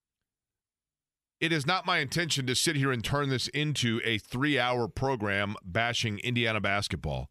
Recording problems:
none

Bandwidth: 14.5 kHz